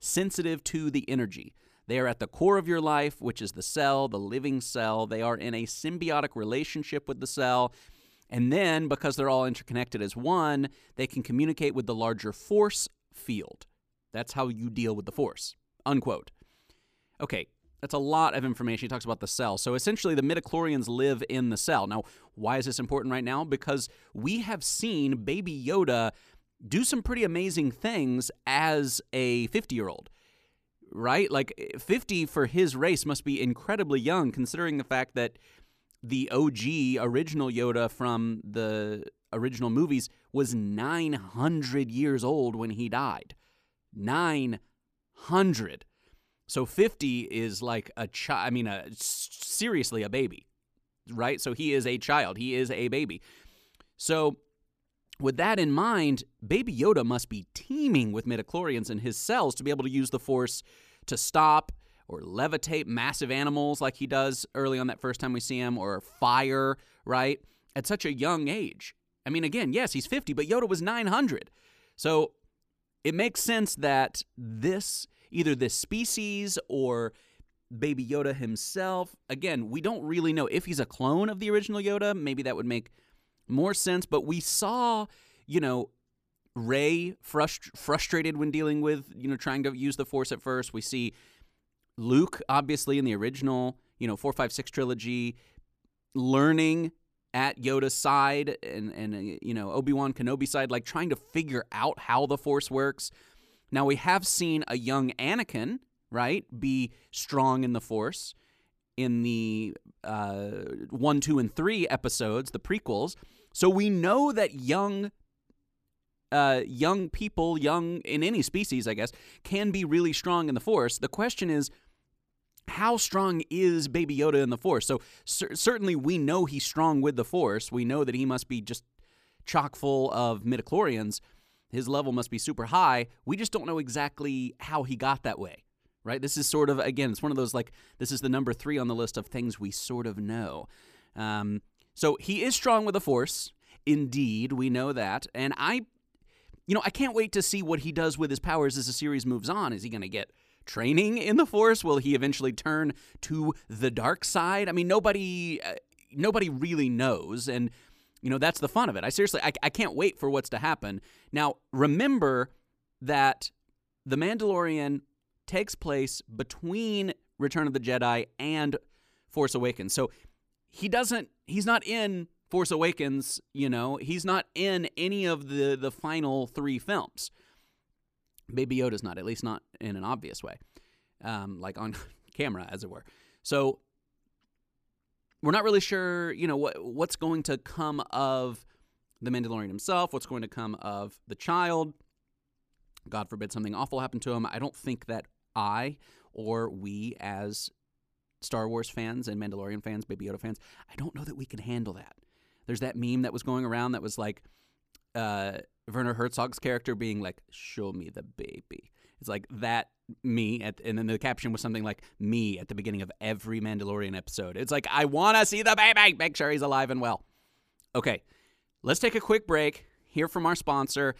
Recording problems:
none

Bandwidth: 14.5 kHz